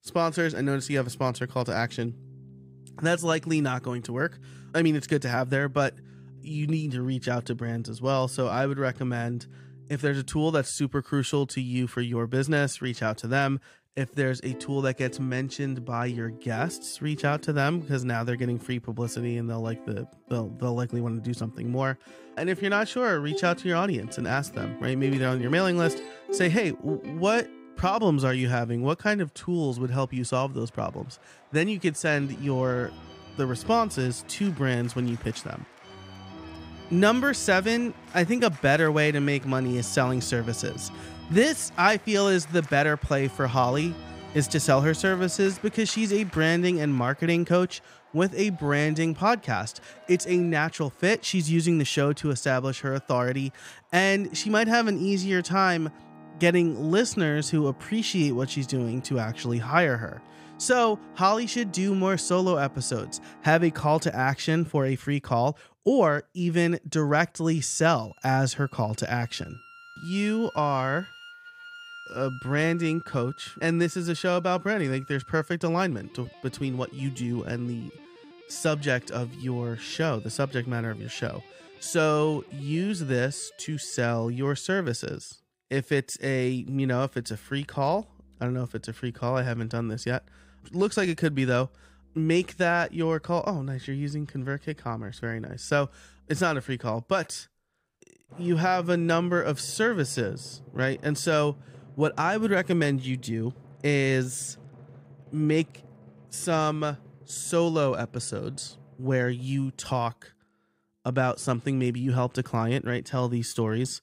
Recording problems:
background music; noticeable; throughout; 20 dB below the speech

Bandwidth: 15.5 kHz